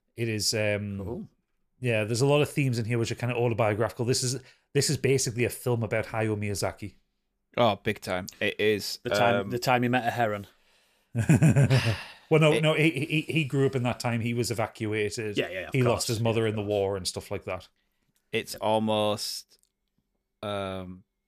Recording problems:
none

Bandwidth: 14.5 kHz